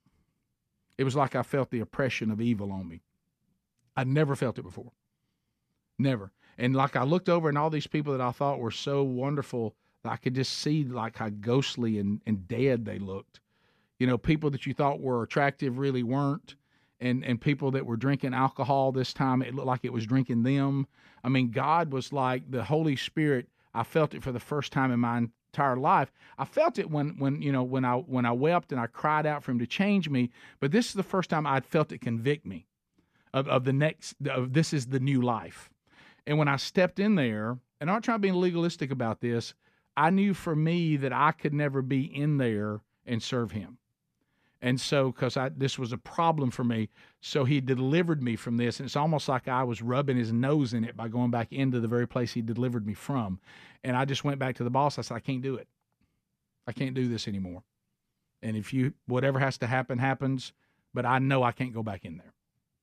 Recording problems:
none

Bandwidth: 14.5 kHz